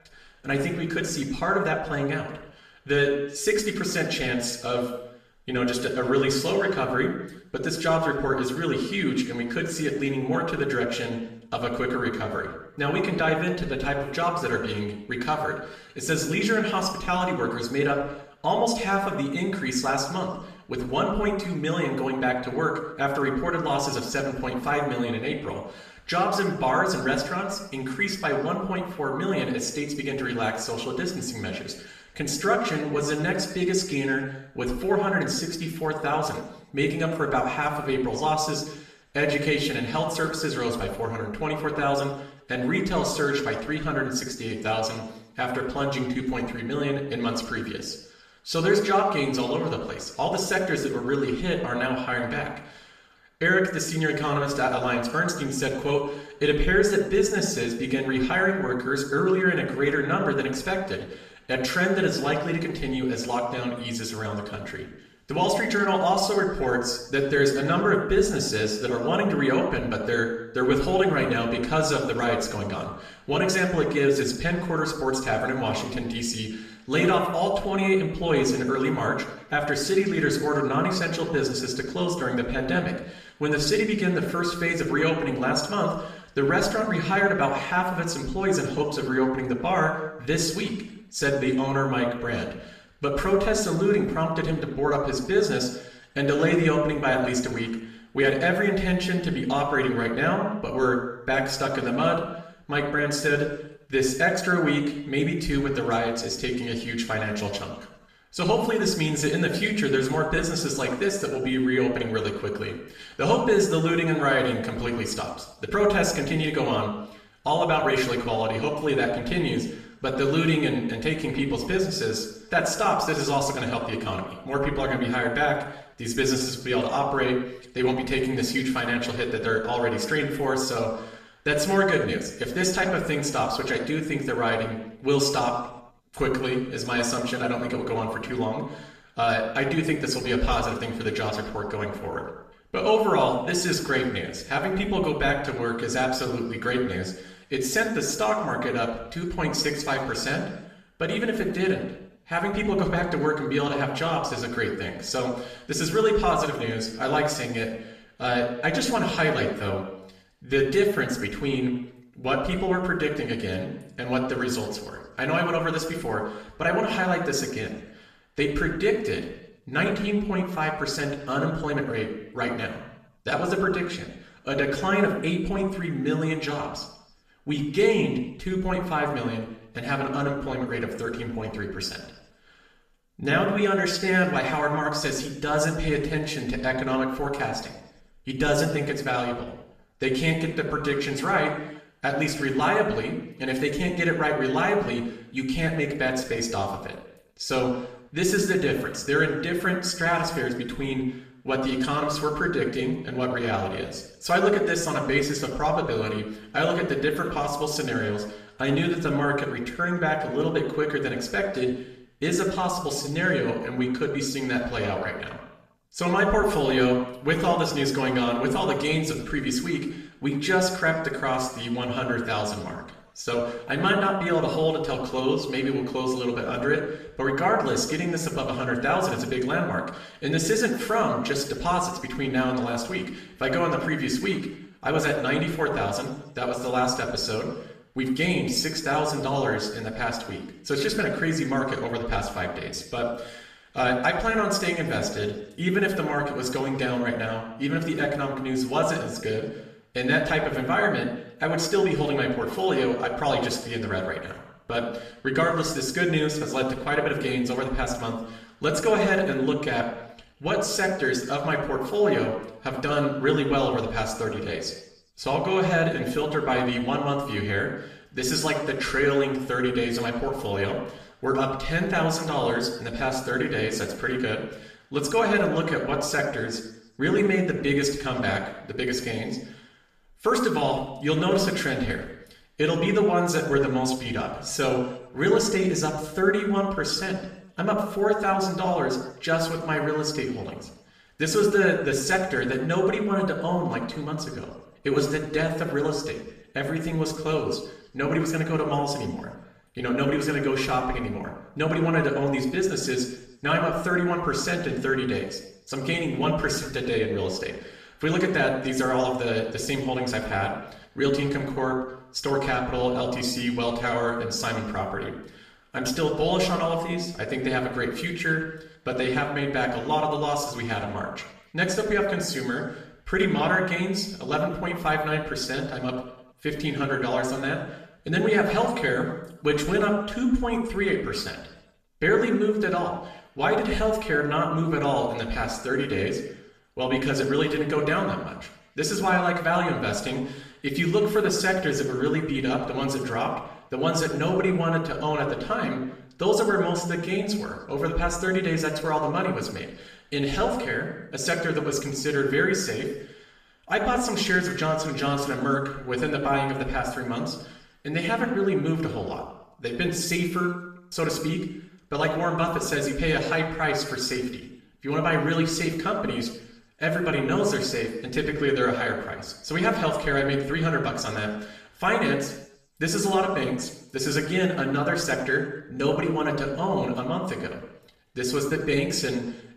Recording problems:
off-mic speech; far
room echo; noticeable; dies away in 0.7 s

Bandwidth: 14.5 kHz